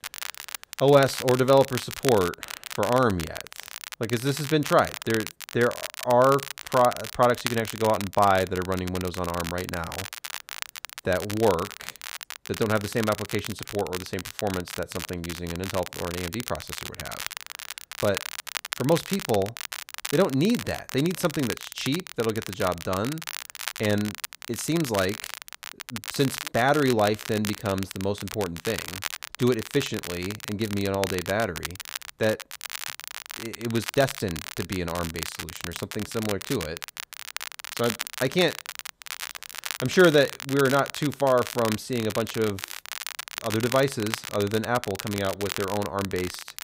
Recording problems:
crackle, like an old record; loud; 9 dB below the speech

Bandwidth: 15.5 kHz